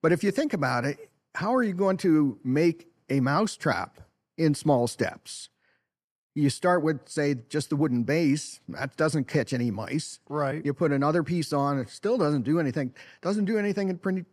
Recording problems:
none

